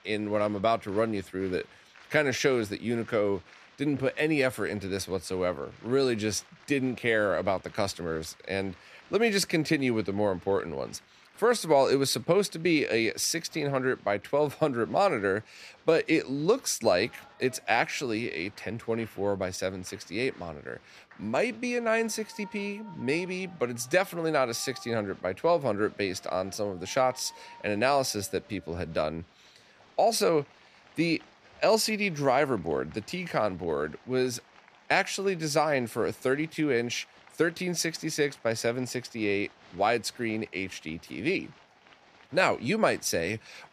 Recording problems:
crowd noise; faint; throughout; 25 dB below the speech

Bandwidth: 14.5 kHz